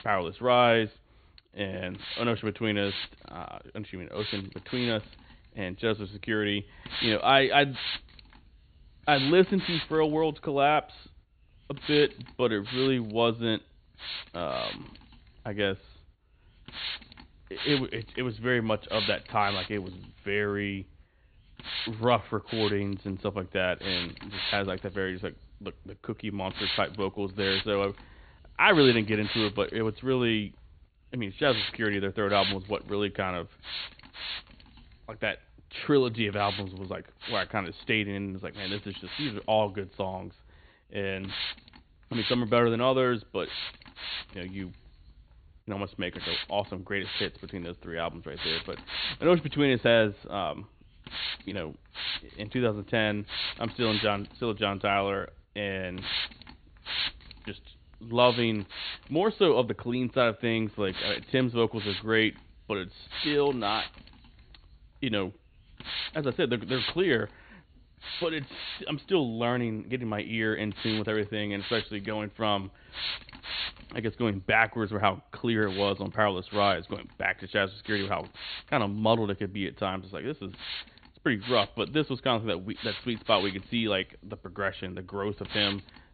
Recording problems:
high frequencies cut off; severe; nothing above 4.5 kHz
hiss; loud; throughout; 6 dB below the speech

